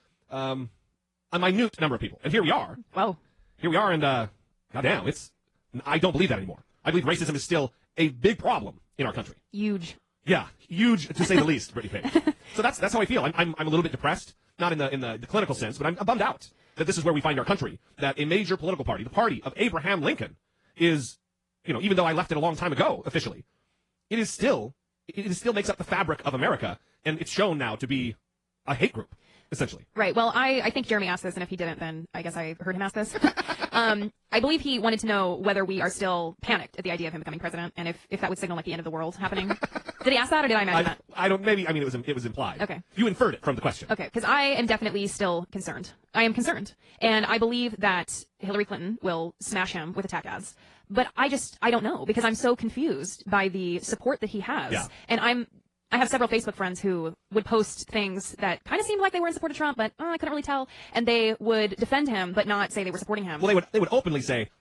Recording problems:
wrong speed, natural pitch; too fast; 1.7 times normal speed
garbled, watery; slightly; nothing above 10.5 kHz

